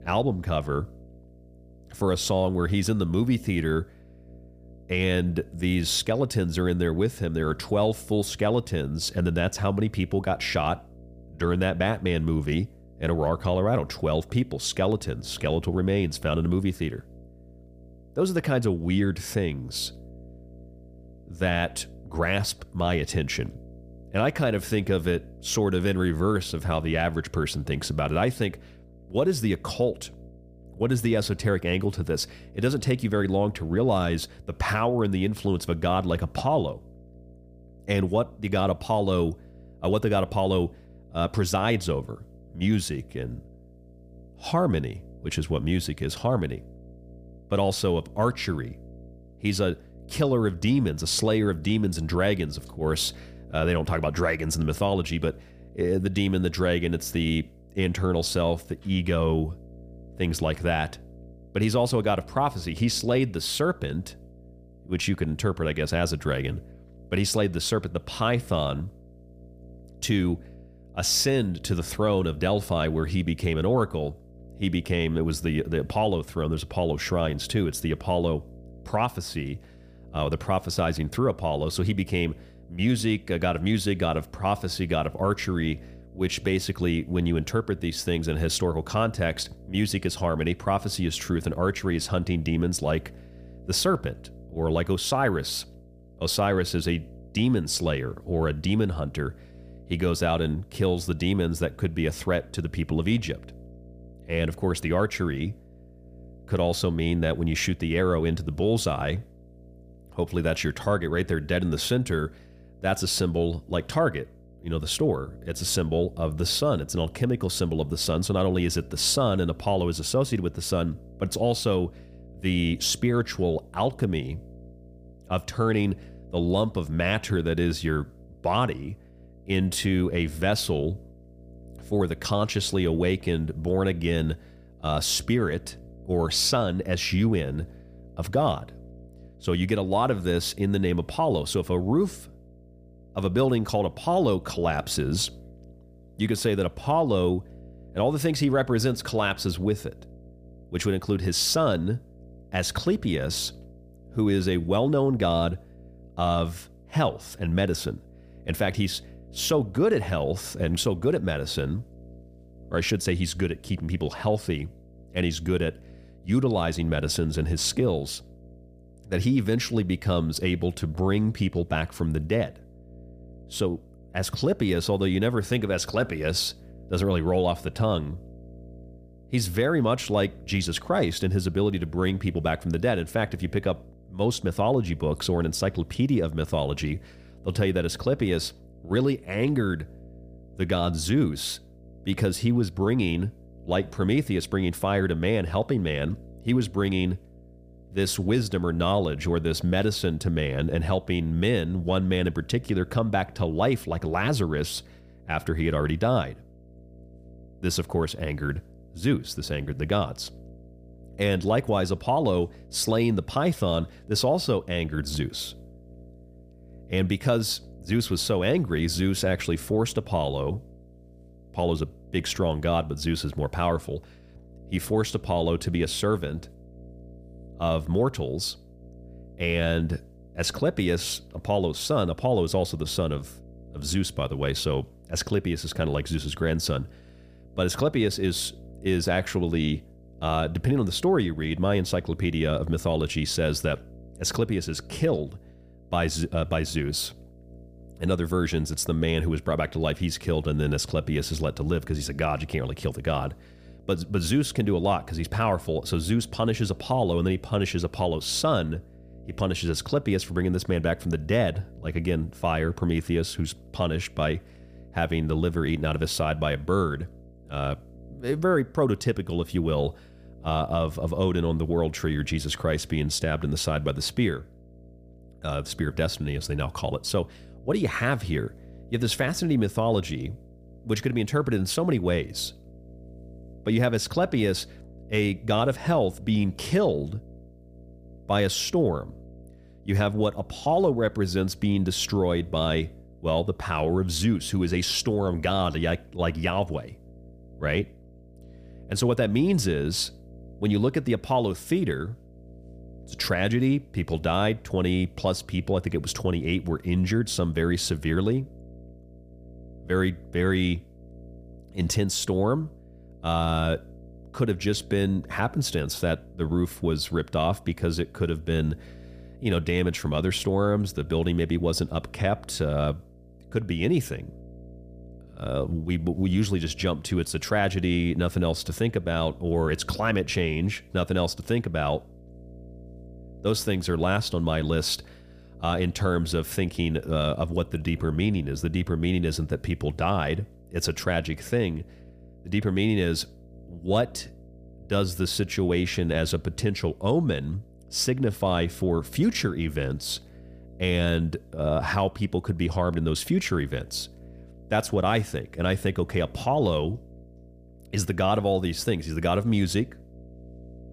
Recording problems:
electrical hum; faint; throughout; 60 Hz, 25 dB below the speech

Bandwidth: 15 kHz